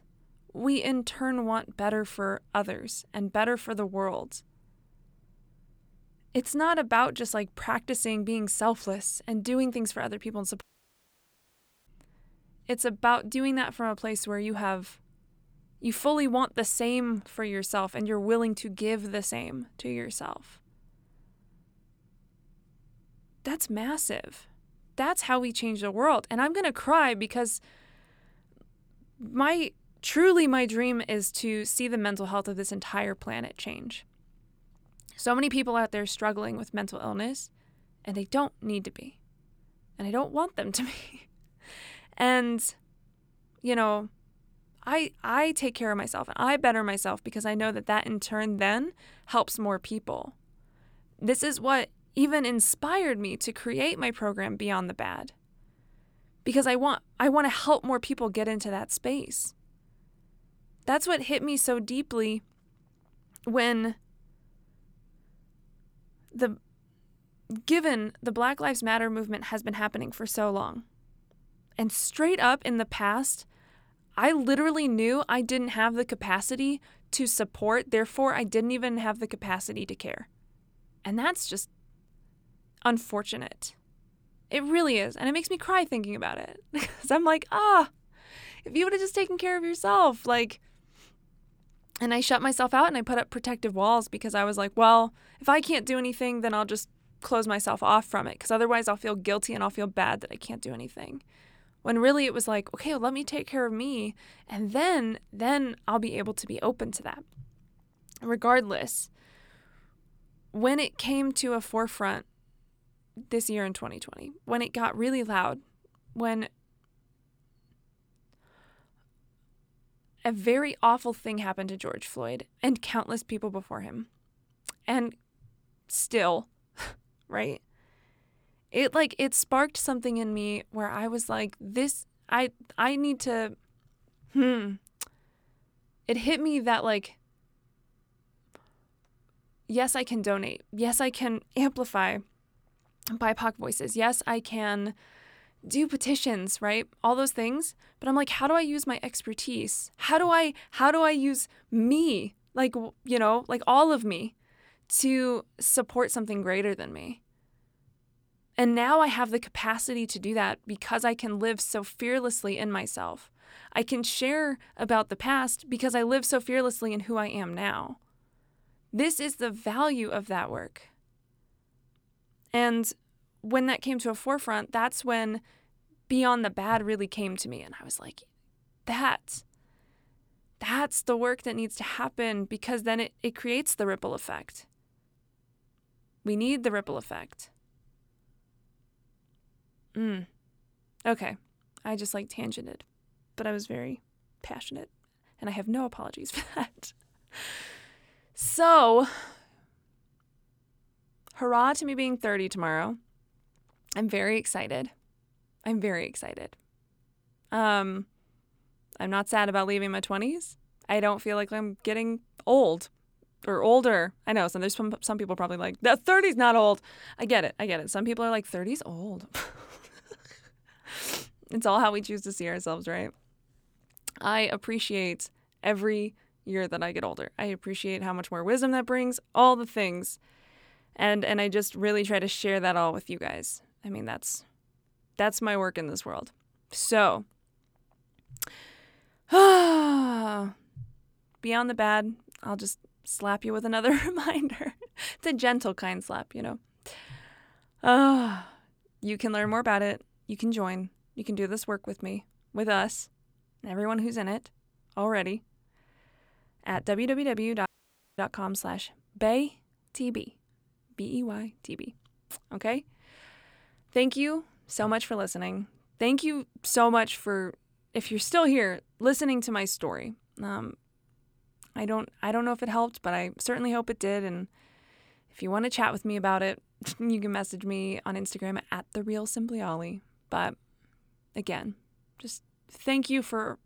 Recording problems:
audio cutting out; at 11 s for 1.5 s and at 4:18 for 0.5 s

